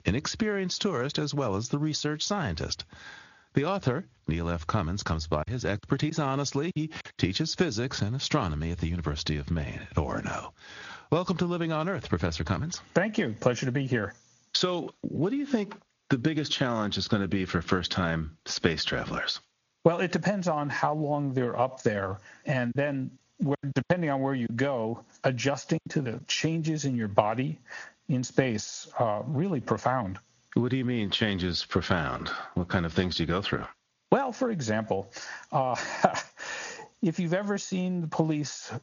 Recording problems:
squashed, flat; heavily
high frequencies cut off; noticeable; nothing above 7 kHz
garbled, watery; slightly
choppy; very; from 5.5 to 7 s and from 23 to 26 s; 8% of the speech affected

